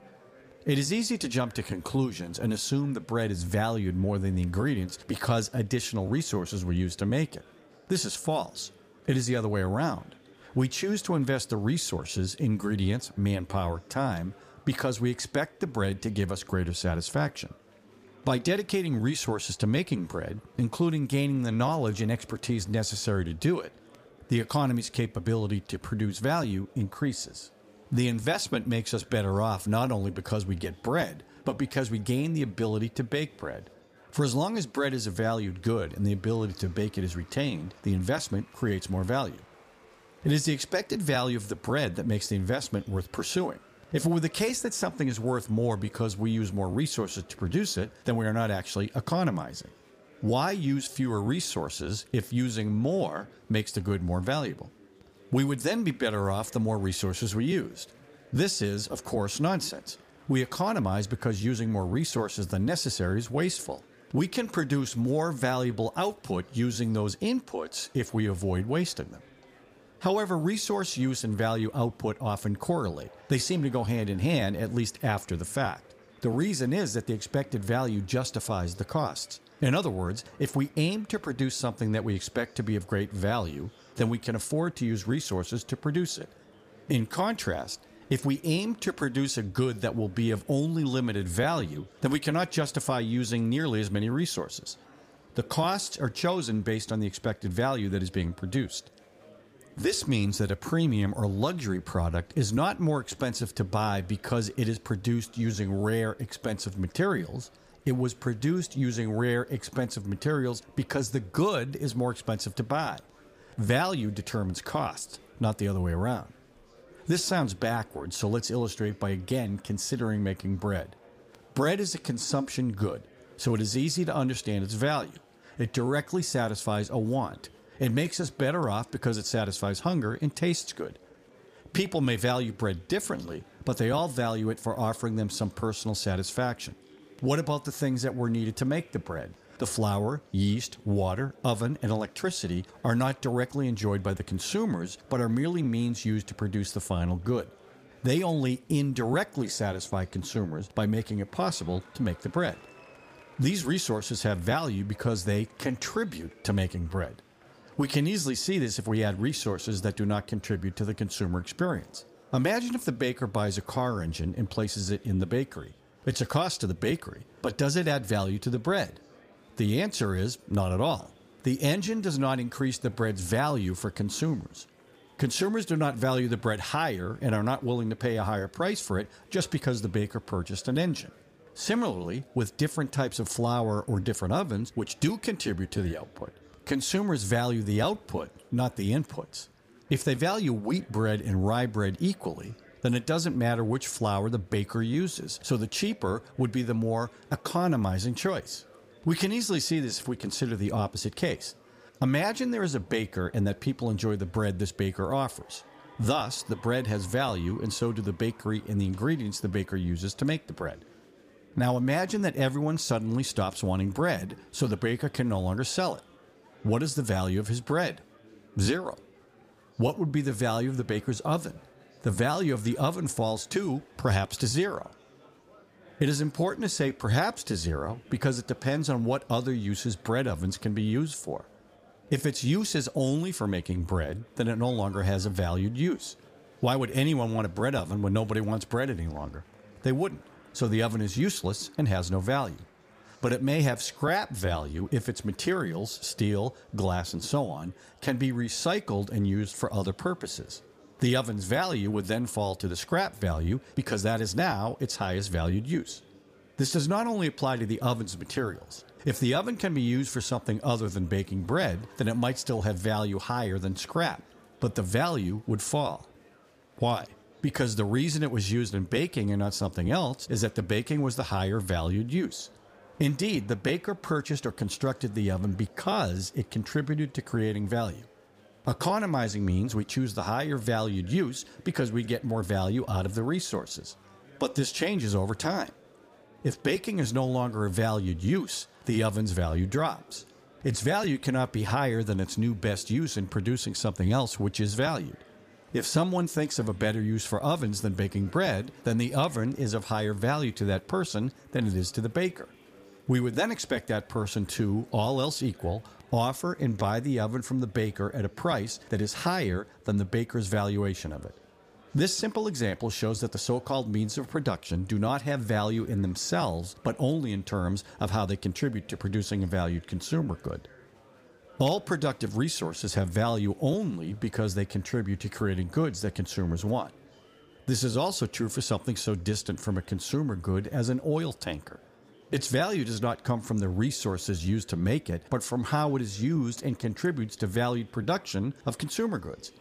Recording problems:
murmuring crowd; faint; throughout; 25 dB below the speech

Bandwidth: 15 kHz